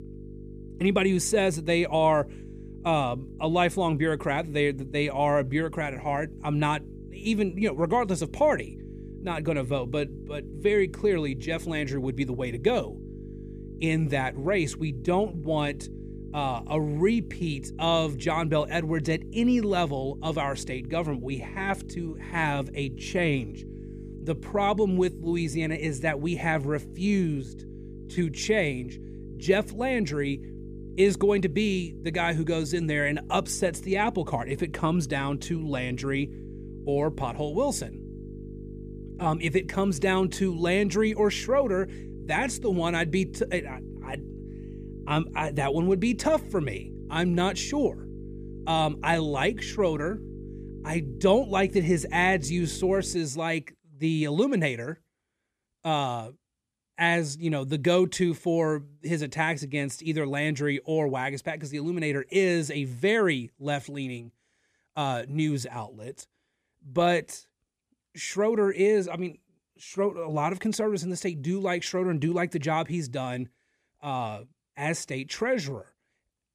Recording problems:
electrical hum; noticeable; until 53 s; 50 Hz, 20 dB below the speech

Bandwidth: 14.5 kHz